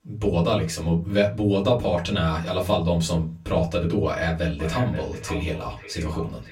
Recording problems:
off-mic speech; far
echo of what is said; noticeable; from 4.5 s on; 530 ms later, 15 dB below the speech
room echo; very slight; dies away in 0.2 s

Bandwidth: 16 kHz